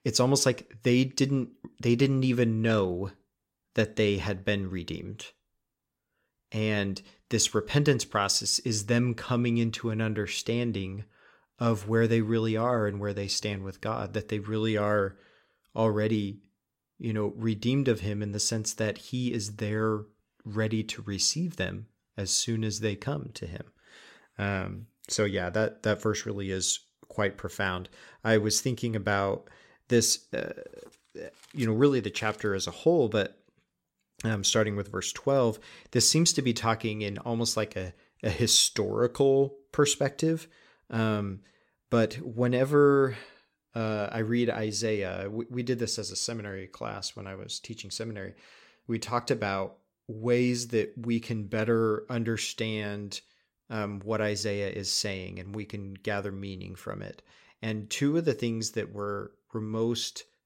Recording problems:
none

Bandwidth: 16 kHz